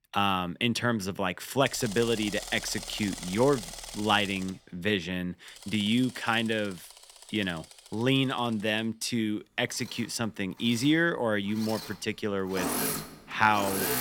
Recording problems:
machinery noise; loud; throughout; 9 dB below the speech

